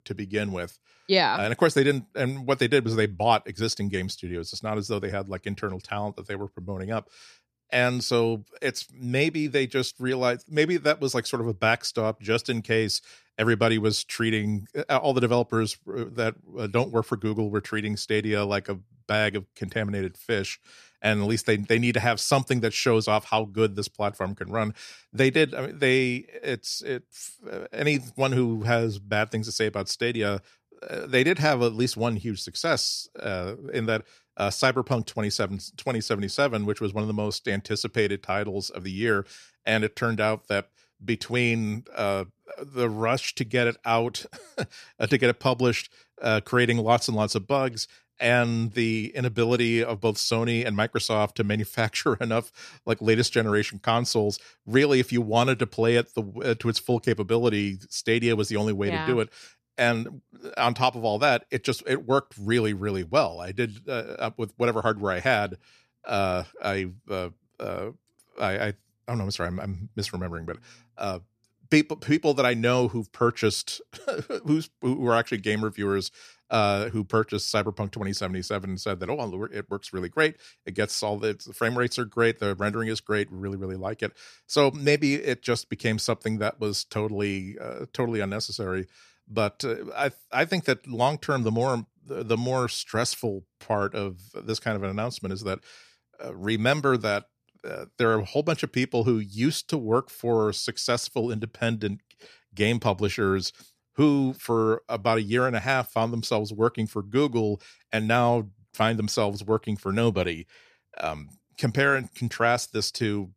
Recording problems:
none

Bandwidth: 14.5 kHz